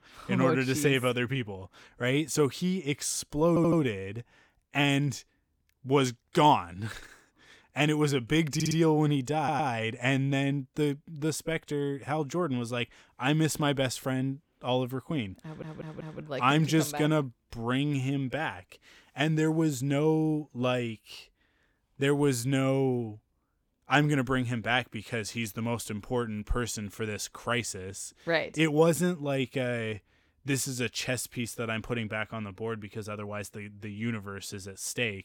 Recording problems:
audio stuttering; 4 times, first at 3.5 s

